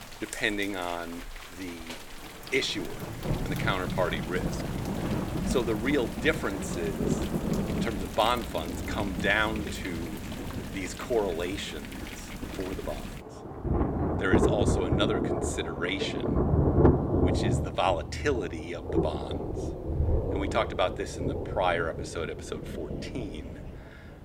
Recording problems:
rain or running water; very loud; throughout; as loud as the speech

